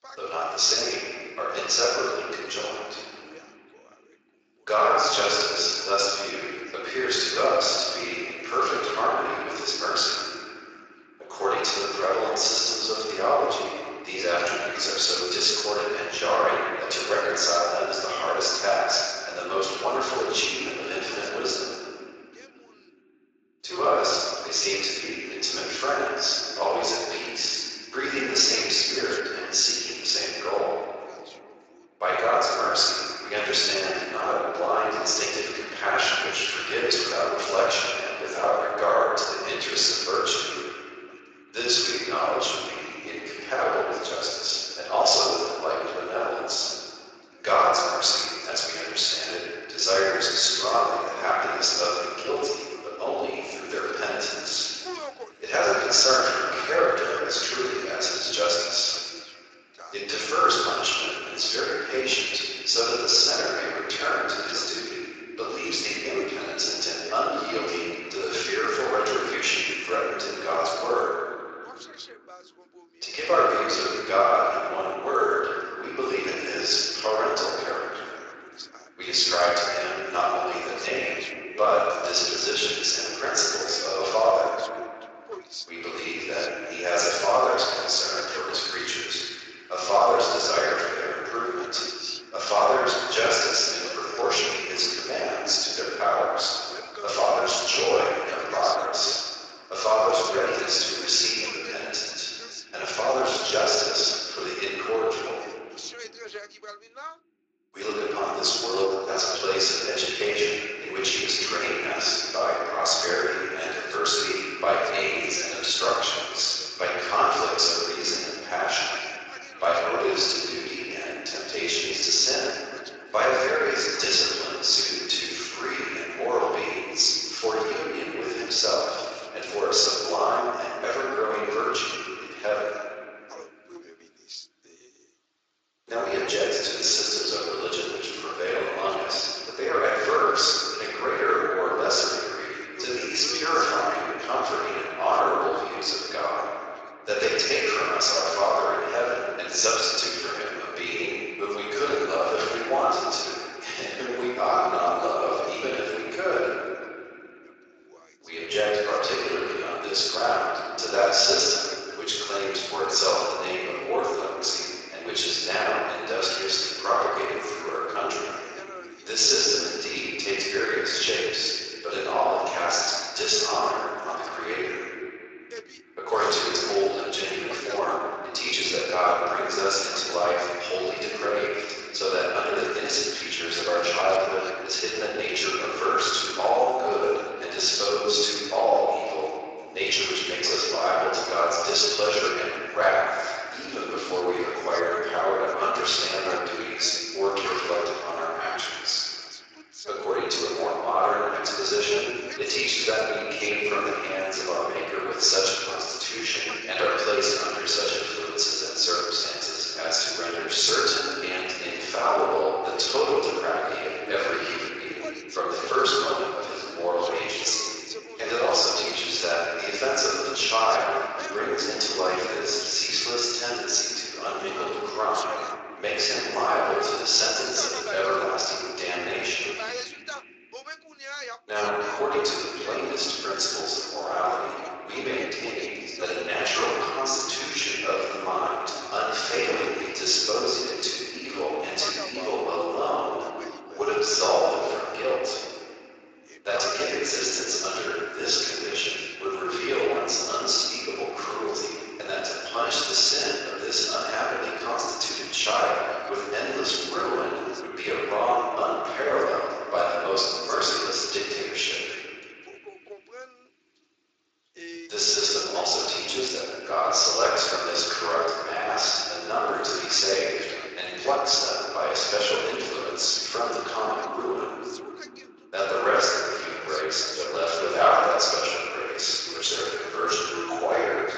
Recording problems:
room echo; strong; dies away in 2.6 s
off-mic speech; far
thin; very; fading below 400 Hz
garbled, watery; slightly
voice in the background; noticeable; throughout; 20 dB below the speech

